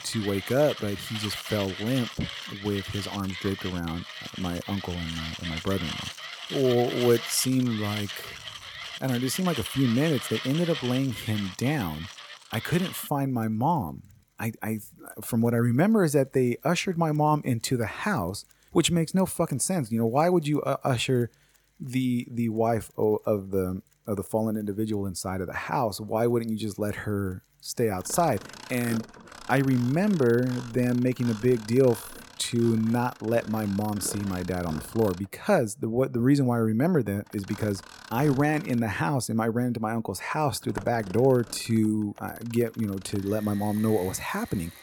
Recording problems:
machinery noise; noticeable; throughout; 10 dB below the speech

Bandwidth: 18 kHz